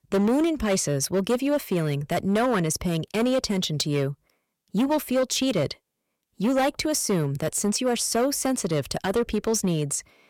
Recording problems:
distortion; slight; 8% of the sound clipped

